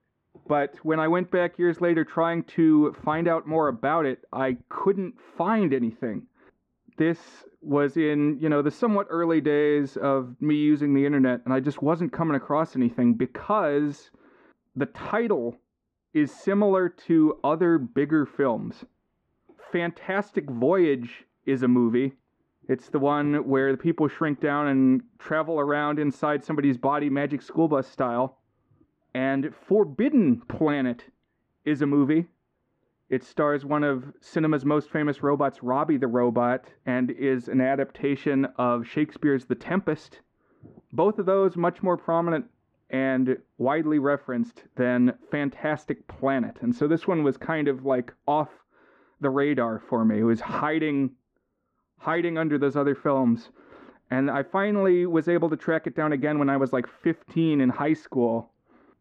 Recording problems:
muffled; very; fading above 1 kHz

